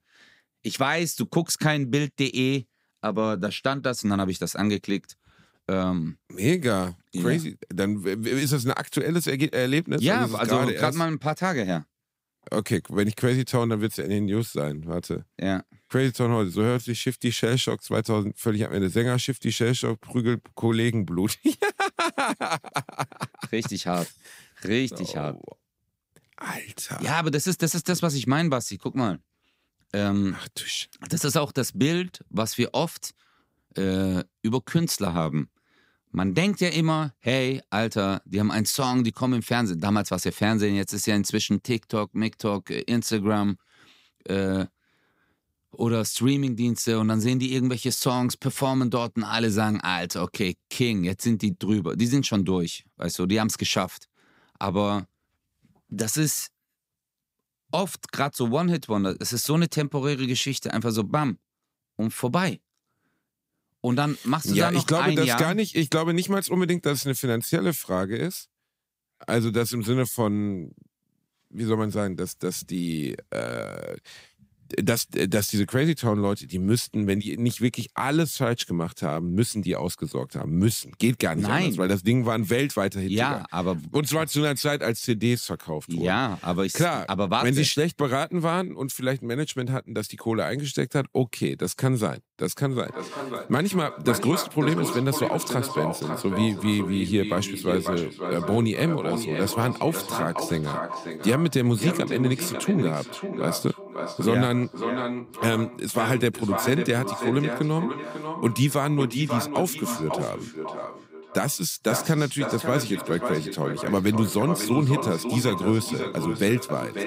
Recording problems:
echo of what is said; strong; from 1:33 on; 550 ms later, 7 dB below the speech

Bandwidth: 15.5 kHz